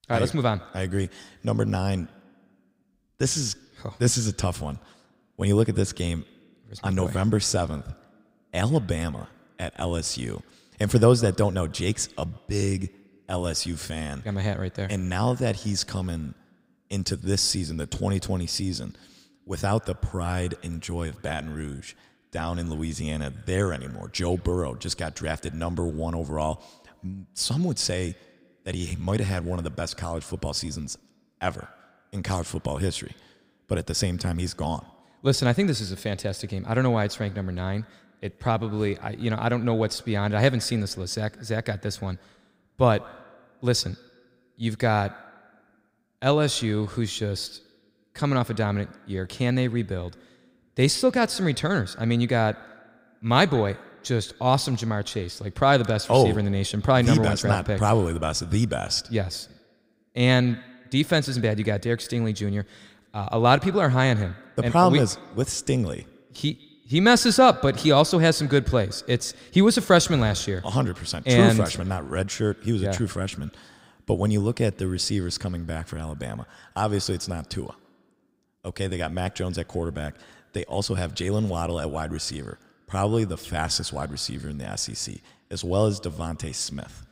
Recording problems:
echo of what is said; faint; throughout; 150 ms later, 25 dB below the speech

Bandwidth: 15.5 kHz